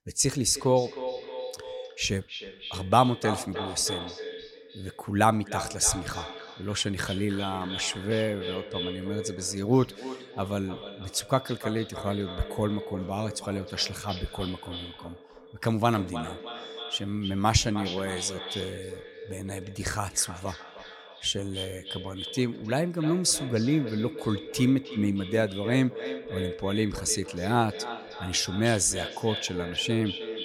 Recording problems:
echo of what is said; strong; throughout; 310 ms later, 10 dB below the speech

